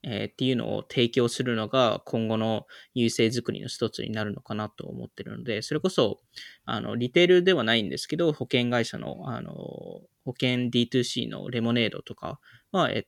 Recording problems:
none

